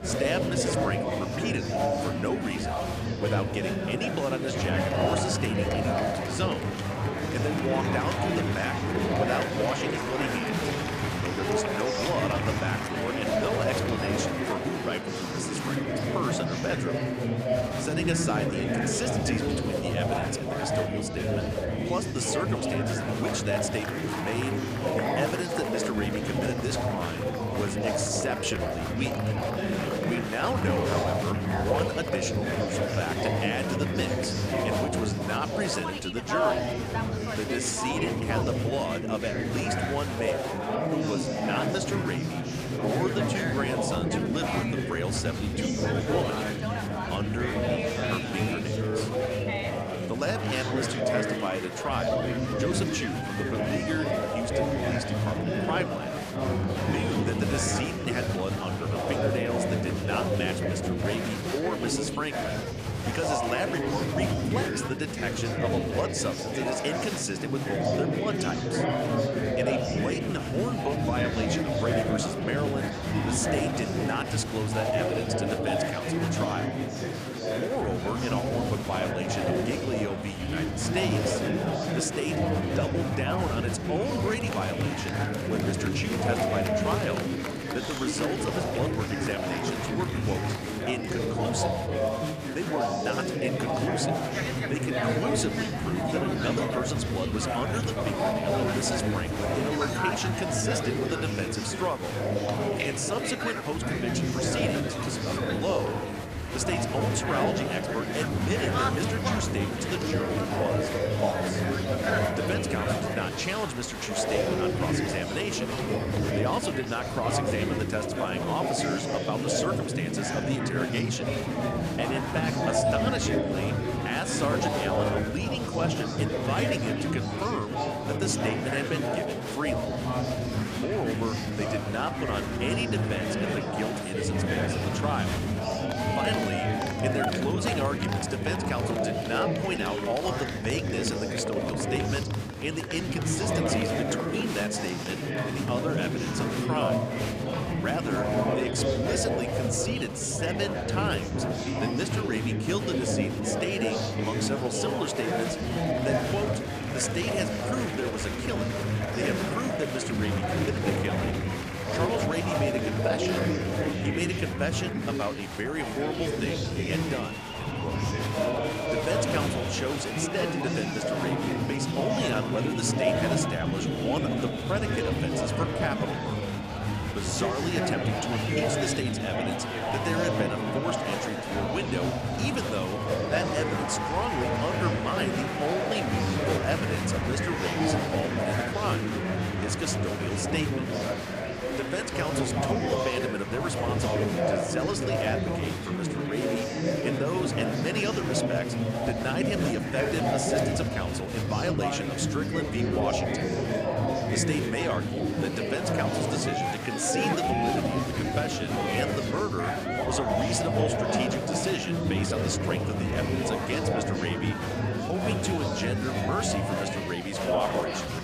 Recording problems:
chatter from many people; very loud; throughout; 4 dB above the speech

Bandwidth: 15 kHz